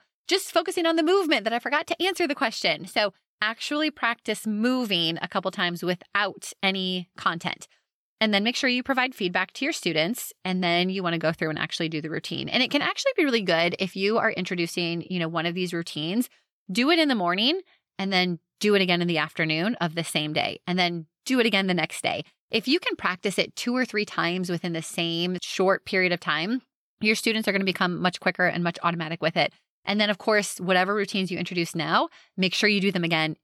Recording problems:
none

